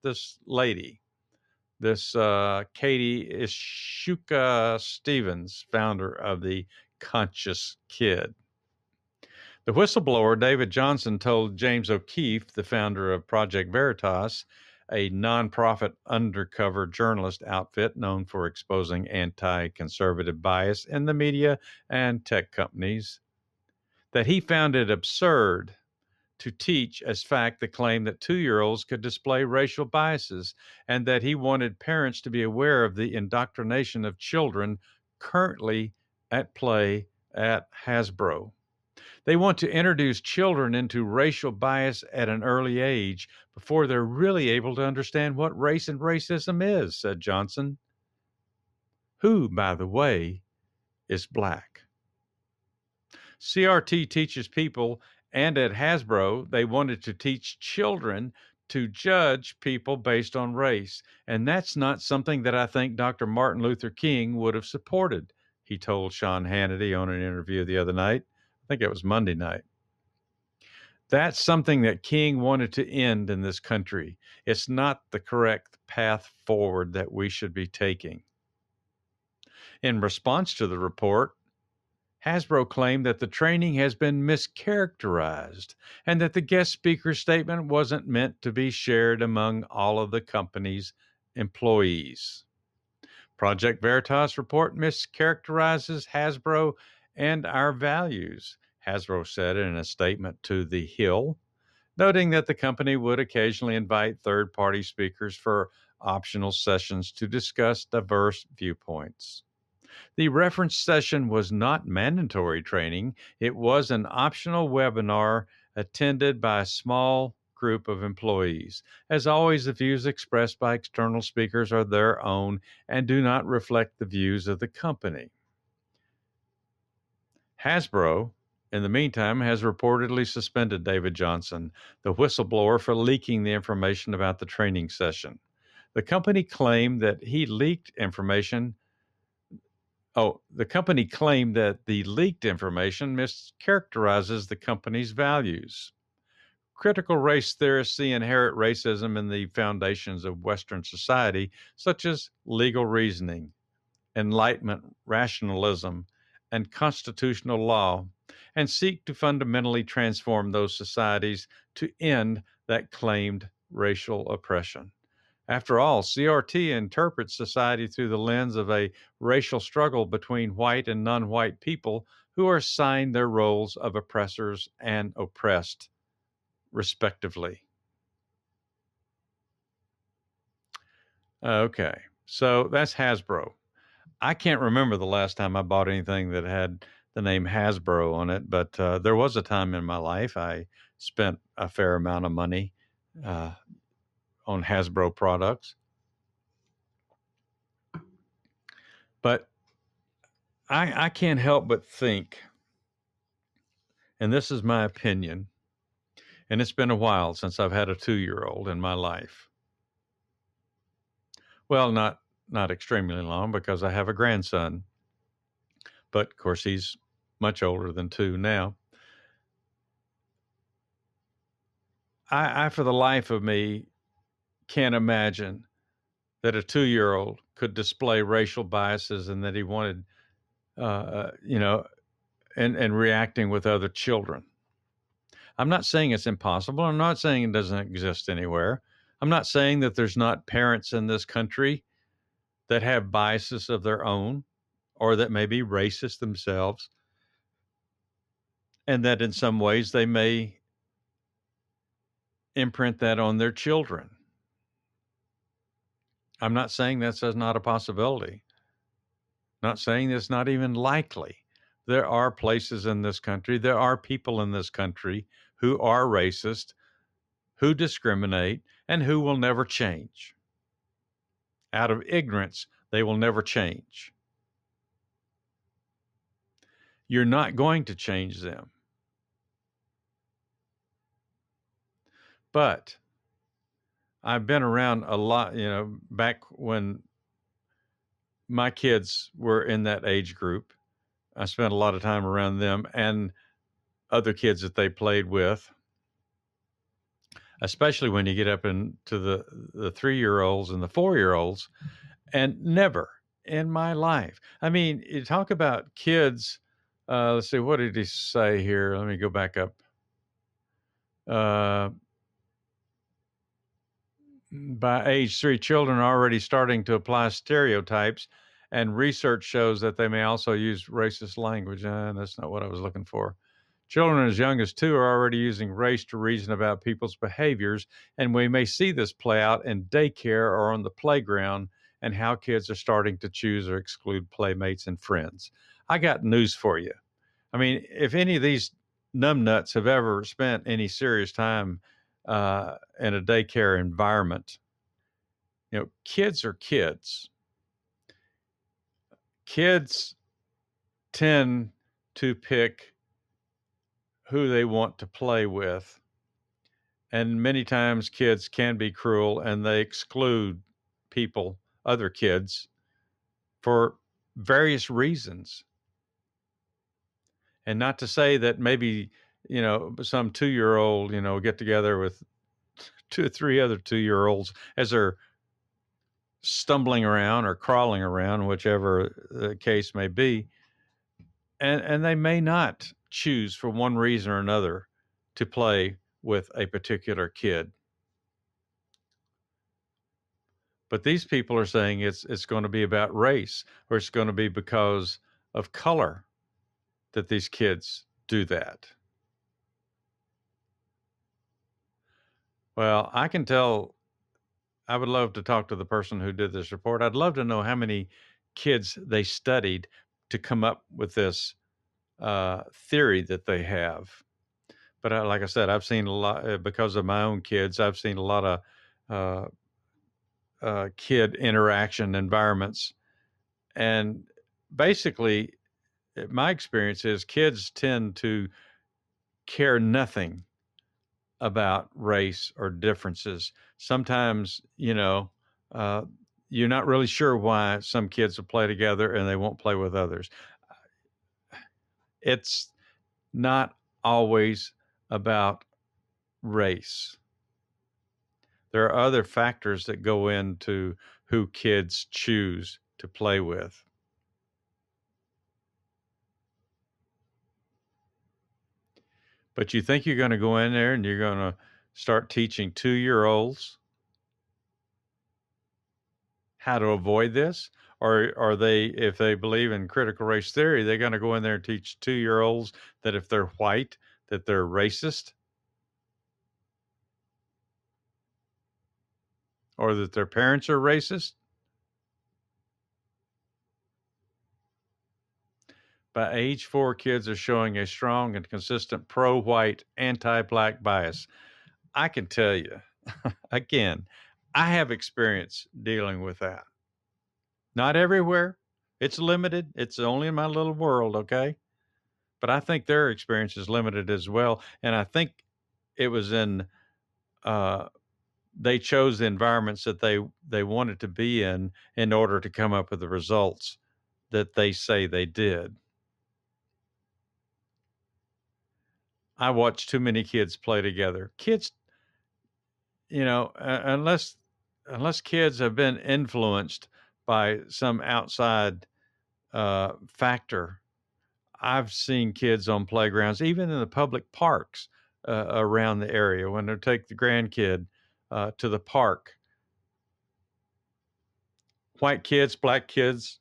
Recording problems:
muffled; very slightly; fading above 3.5 kHz

